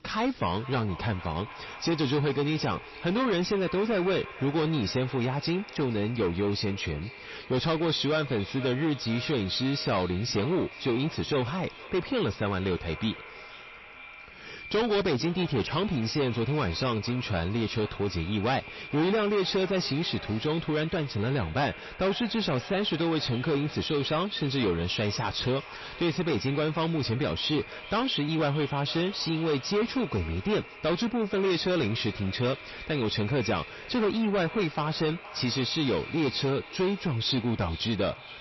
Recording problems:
distortion; heavy; 8 dB below the speech
echo of what is said; noticeable; throughout; 460 ms later, 15 dB below the speech
garbled, watery; slightly; nothing above 5.5 kHz

